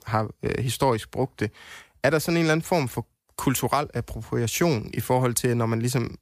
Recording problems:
none

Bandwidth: 15 kHz